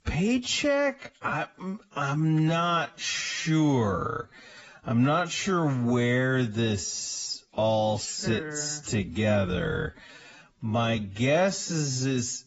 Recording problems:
garbled, watery; badly; nothing above 7.5 kHz
wrong speed, natural pitch; too slow; 0.5 times normal speed

